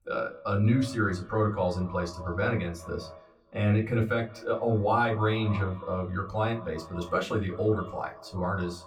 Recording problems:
off-mic speech; far
echo of what is said; noticeable; throughout; 190 ms later, 15 dB below the speech
room echo; very slight; dies away in 0.2 s

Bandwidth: 17.5 kHz